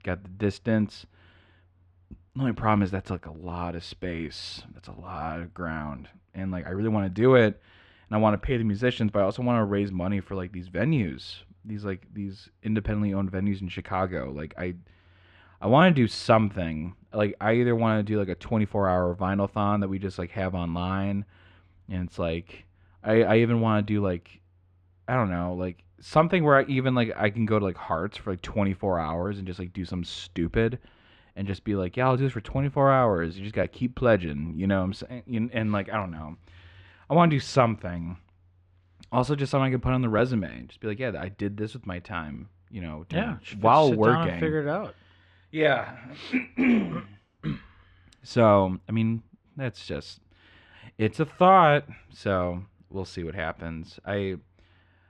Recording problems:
muffled; slightly; fading above 3 kHz

